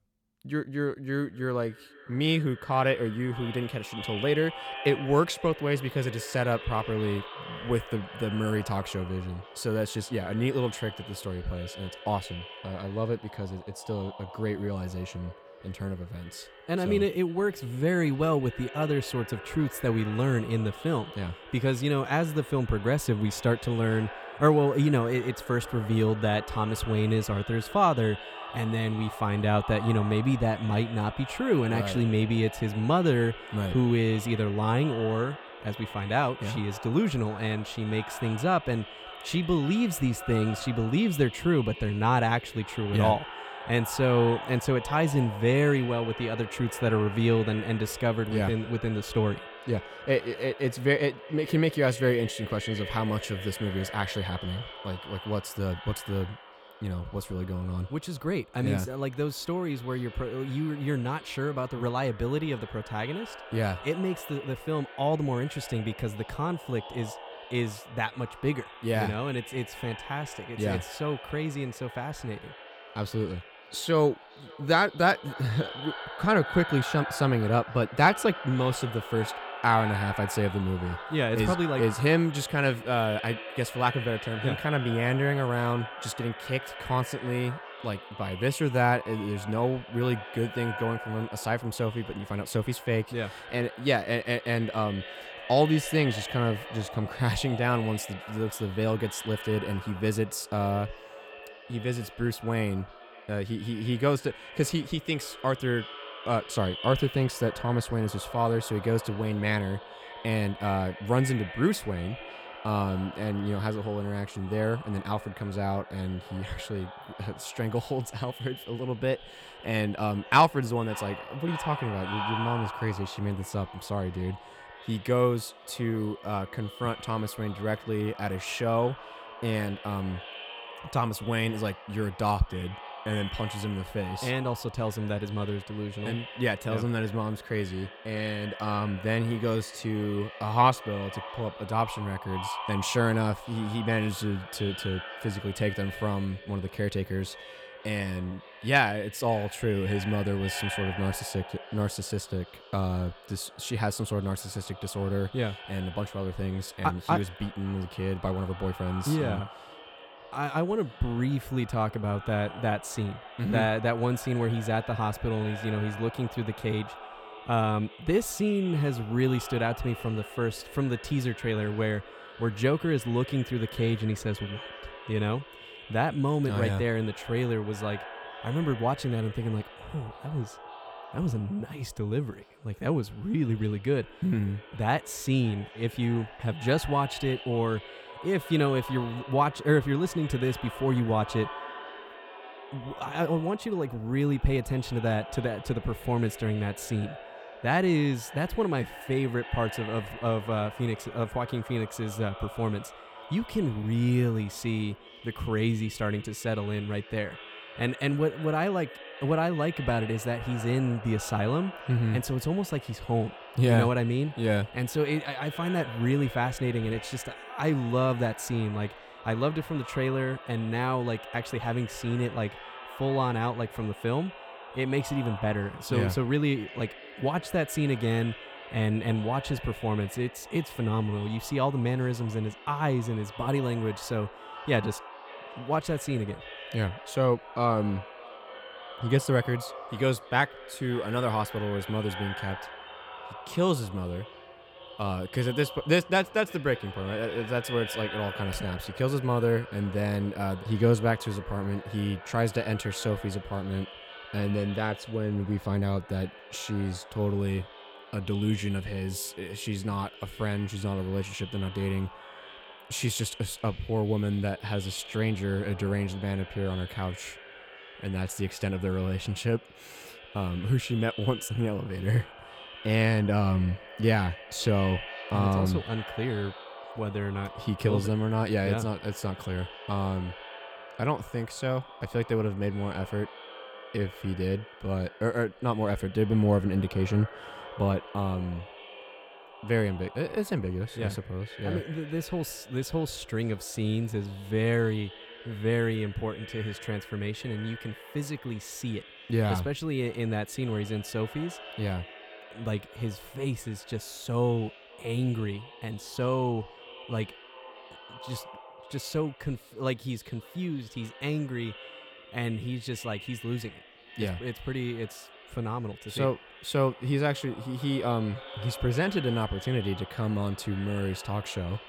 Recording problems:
echo of what is said; noticeable; throughout; 560 ms later, 15 dB below the speech

